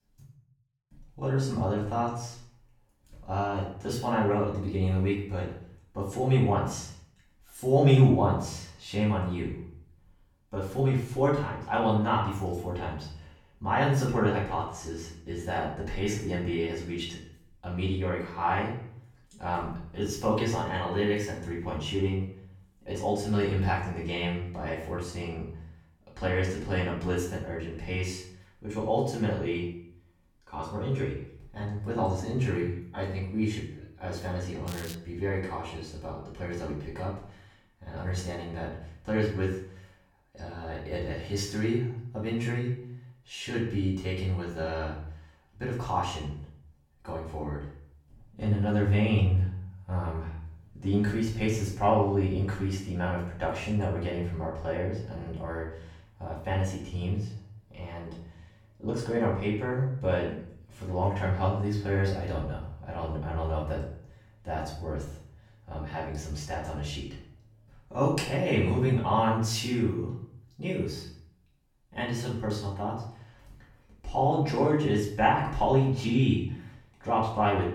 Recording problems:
off-mic speech; far
room echo; noticeable; dies away in 0.5 s
crackling; noticeable; at 35 s; 15 dB below the speech

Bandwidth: 17.5 kHz